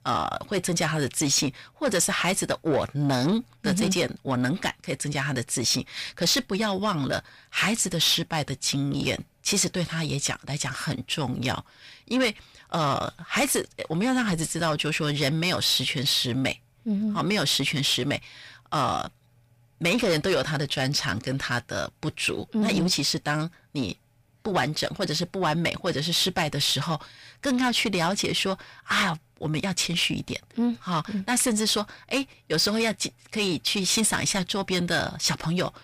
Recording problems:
distortion; slight; 10 dB below the speech

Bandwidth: 15 kHz